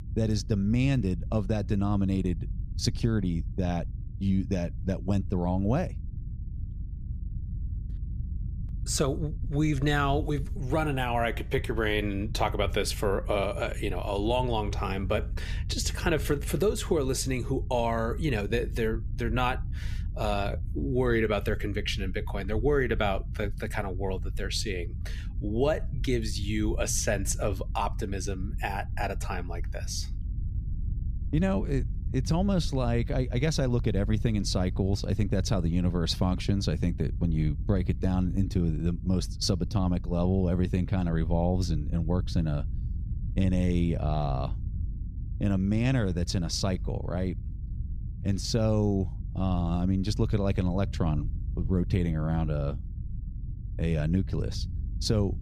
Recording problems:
low rumble; noticeable; throughout; 20 dB below the speech

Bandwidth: 14.5 kHz